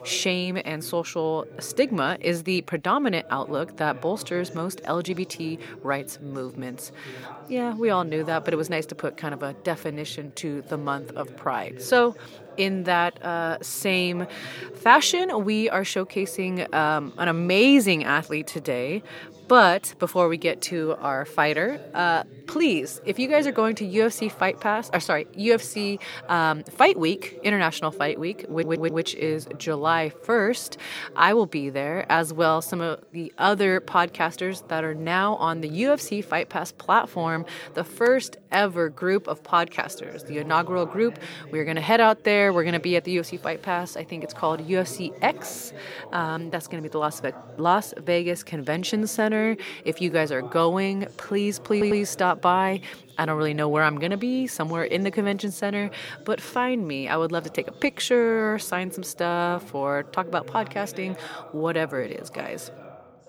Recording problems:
background chatter; noticeable; throughout; 3 voices, 20 dB below the speech
audio stuttering; at 29 s and at 52 s

